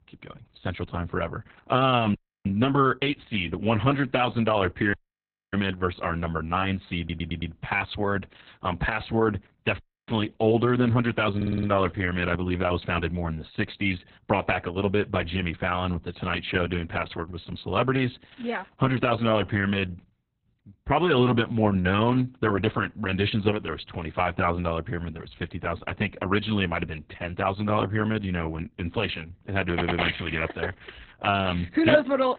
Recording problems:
garbled, watery; badly; nothing above 3.5 kHz
audio cutting out; at 2 s, at 5 s for 0.5 s and at 10 s
audio stuttering; at 7 s, at 11 s and at 30 s

